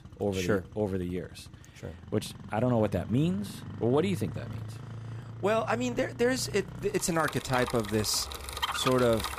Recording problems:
traffic noise; noticeable; throughout; 10 dB below the speech

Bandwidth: 15 kHz